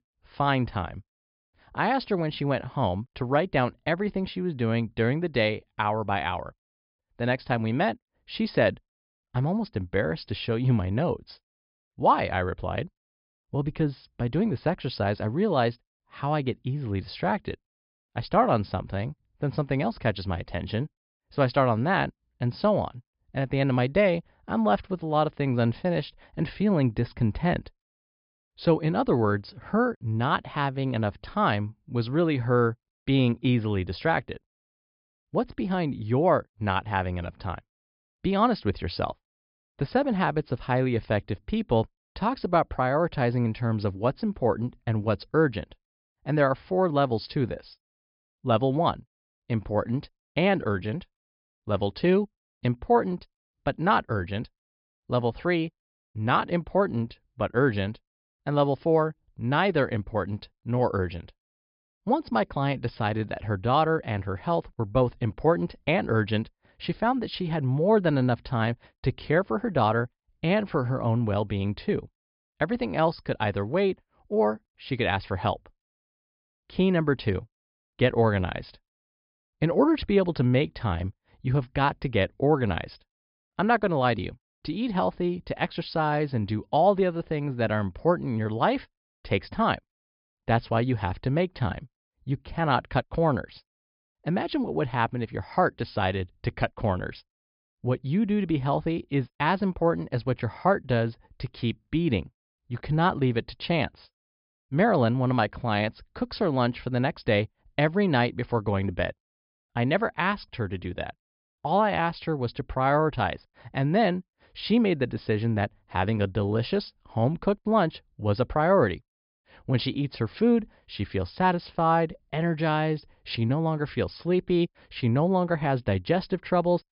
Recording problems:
high frequencies cut off; noticeable; nothing above 5 kHz

